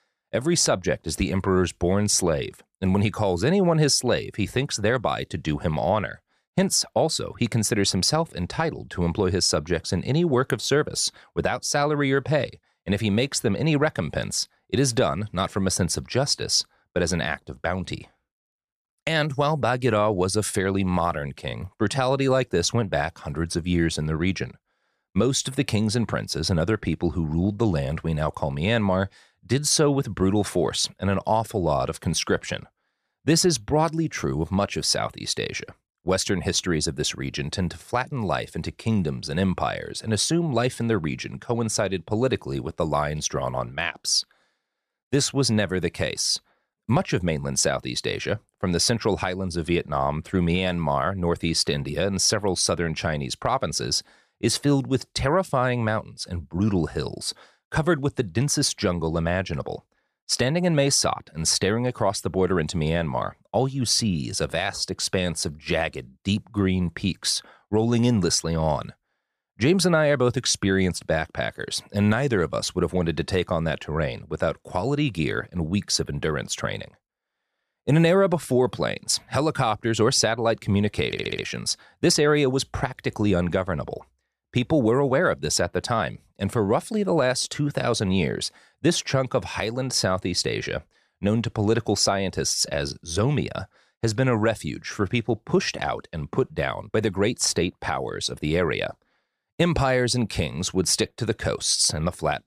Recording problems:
audio stuttering; at 1:21

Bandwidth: 14.5 kHz